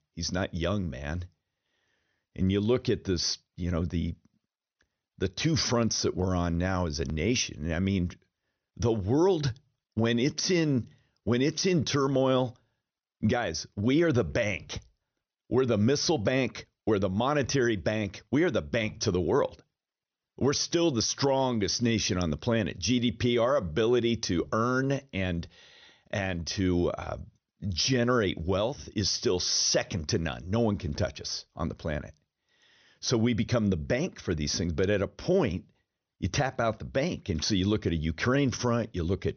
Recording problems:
high frequencies cut off; noticeable; nothing above 6.5 kHz

